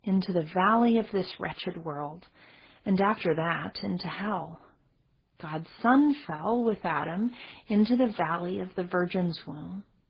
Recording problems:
garbled, watery; badly; nothing above 5 kHz

